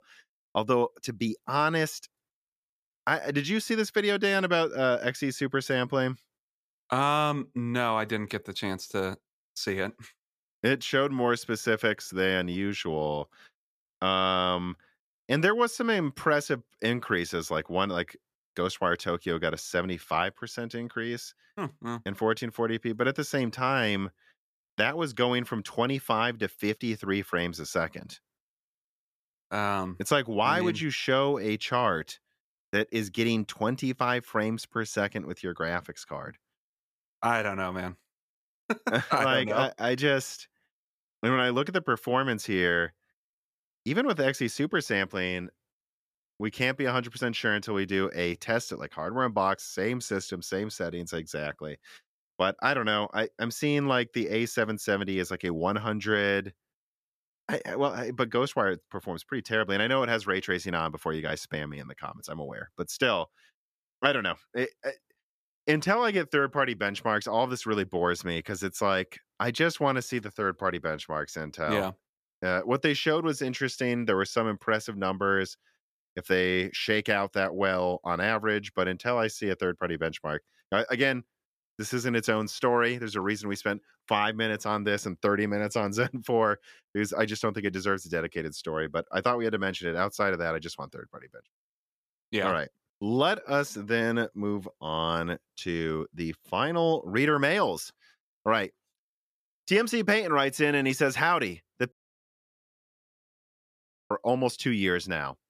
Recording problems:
audio cutting out; at 1:42 for 2 s

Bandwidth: 14.5 kHz